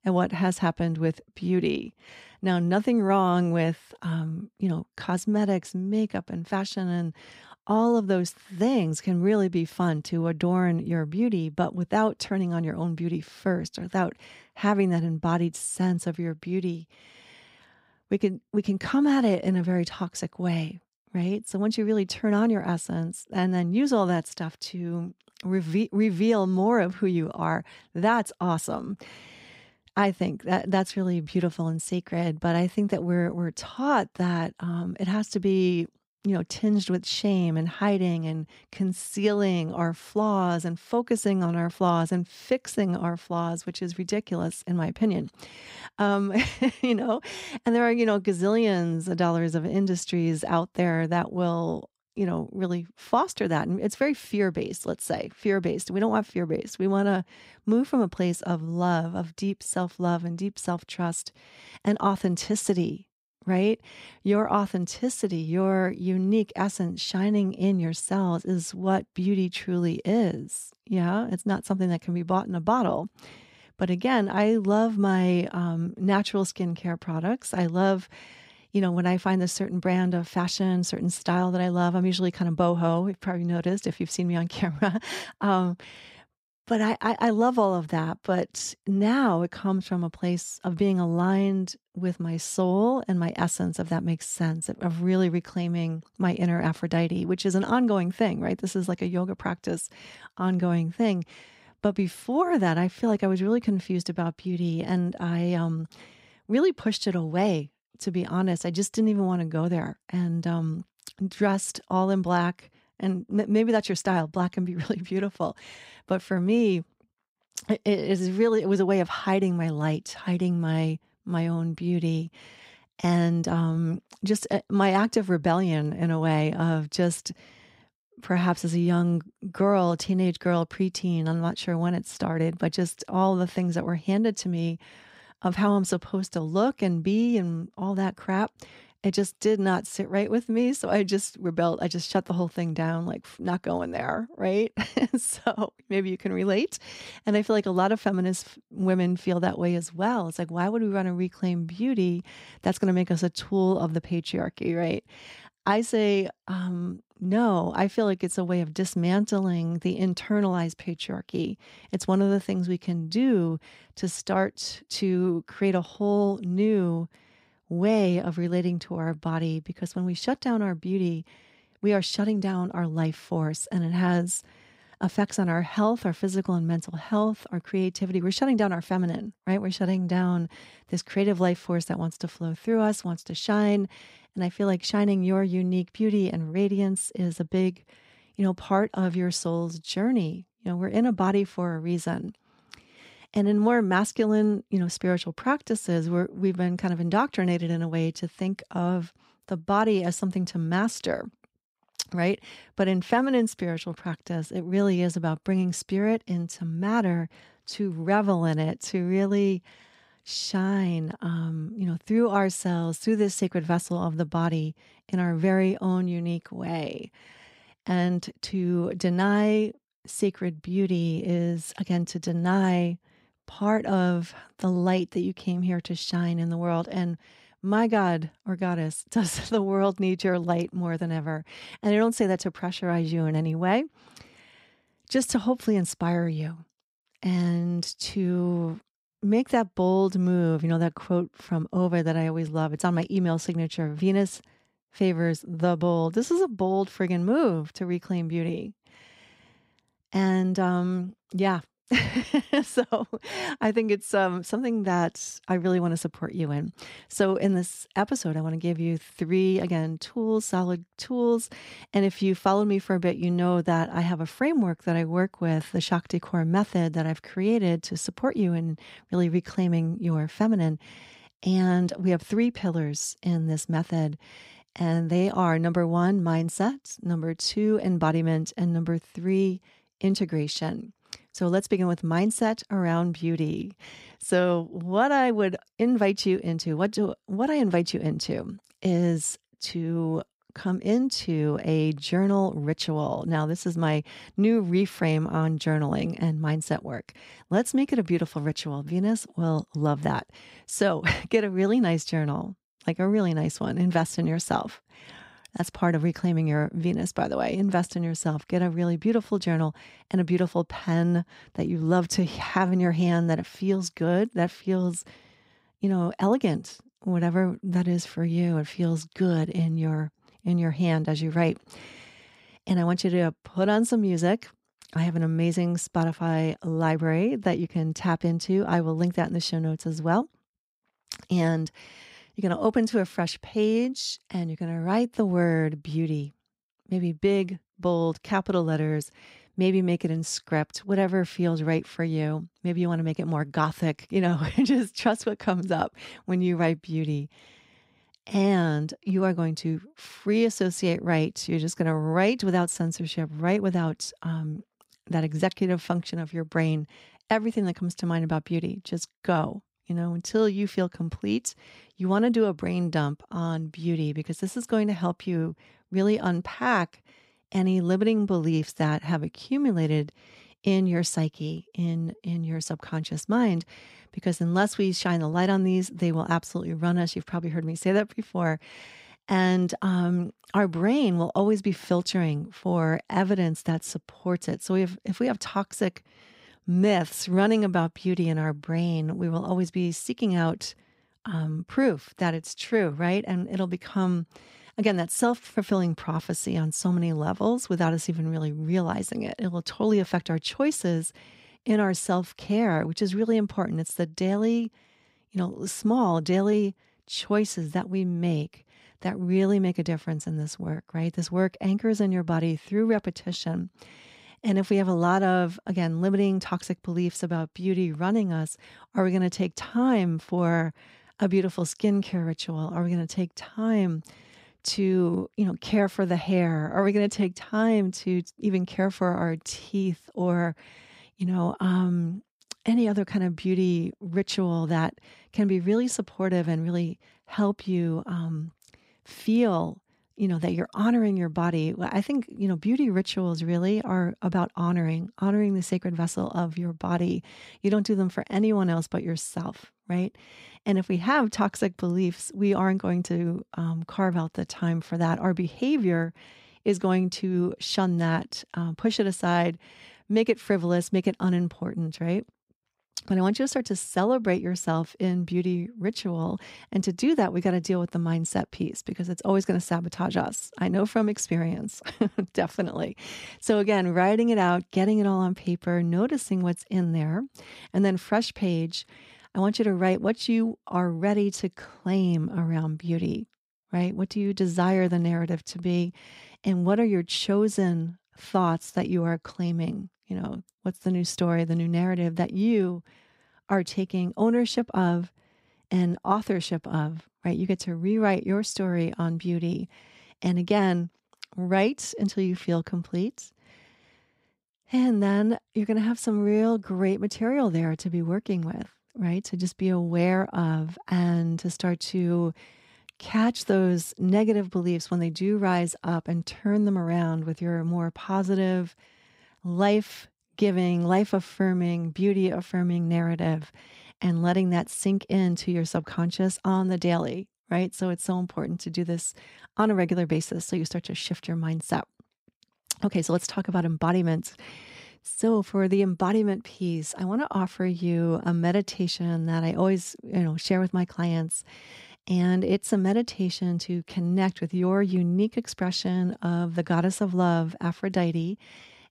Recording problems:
none

